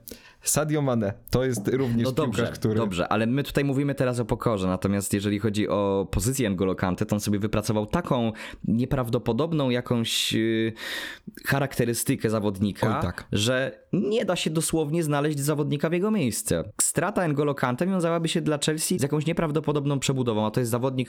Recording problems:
squashed, flat; somewhat

